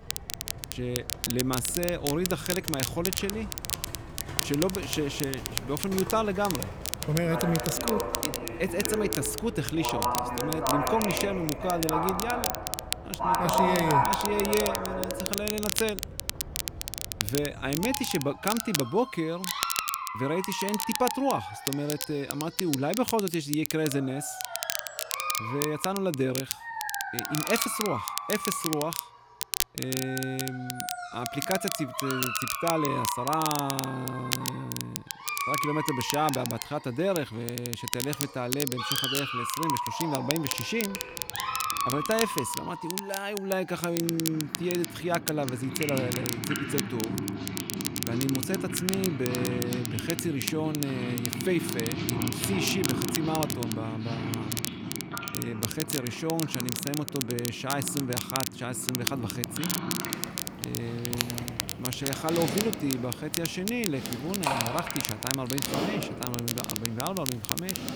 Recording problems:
animal sounds; loud; throughout; 4 dB below the speech
crackle, like an old record; loud; 2 dB below the speech

